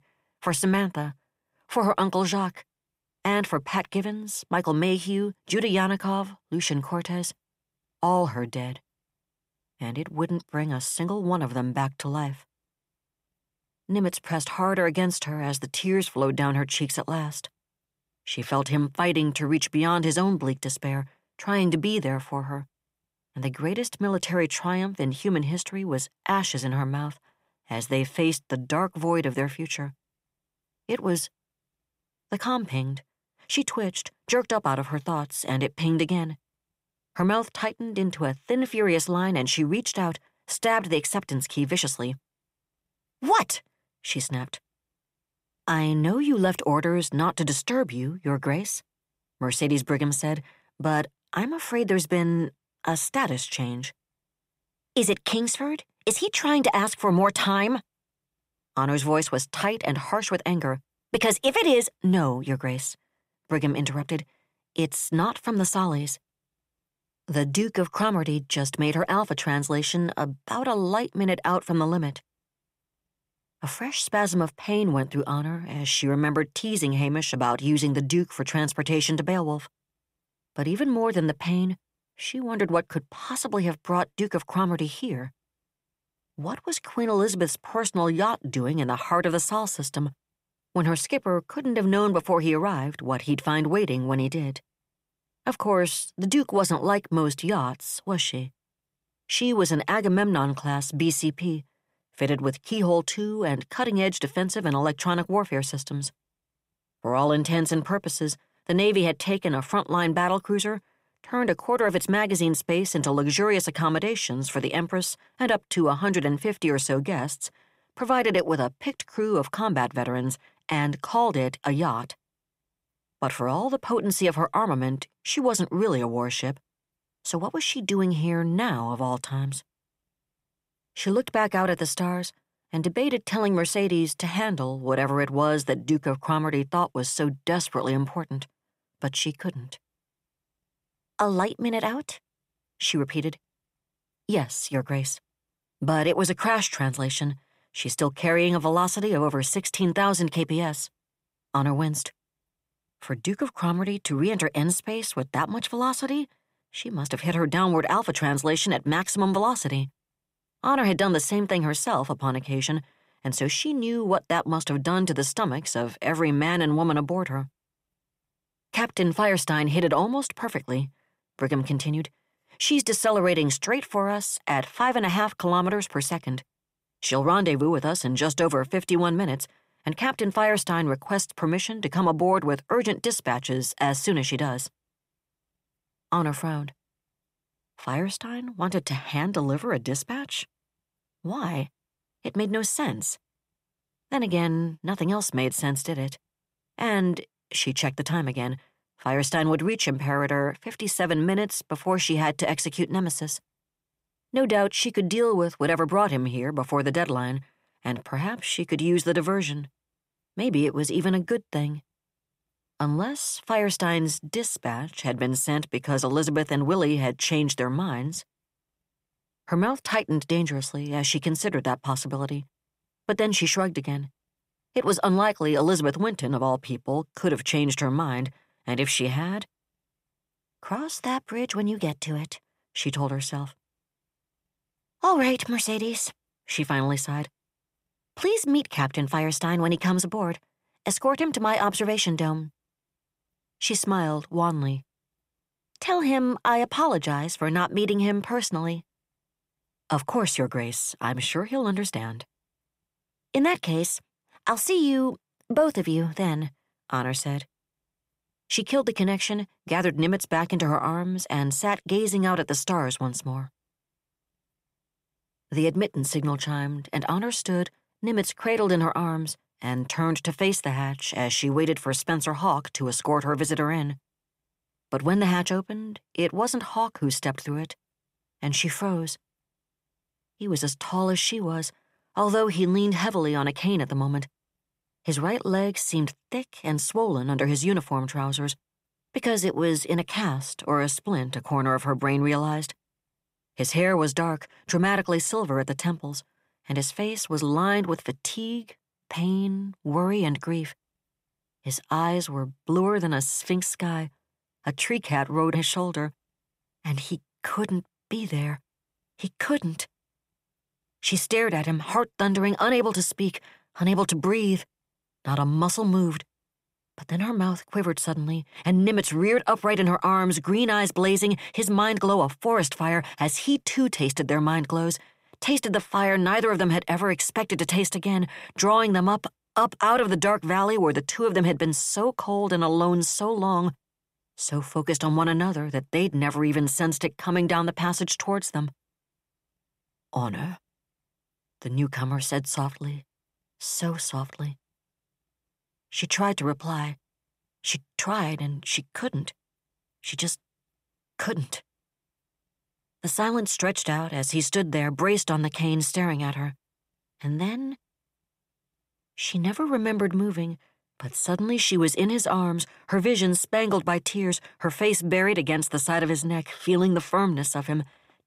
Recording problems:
none

